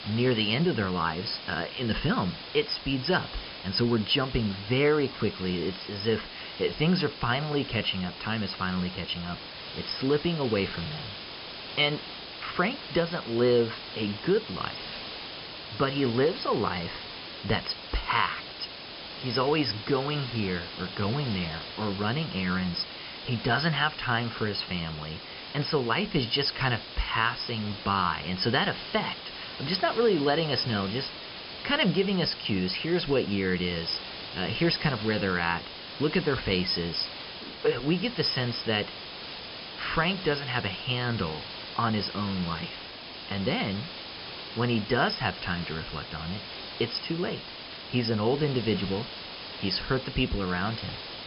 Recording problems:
high frequencies cut off; noticeable; nothing above 5.5 kHz
hiss; loud; throughout; 10 dB below the speech

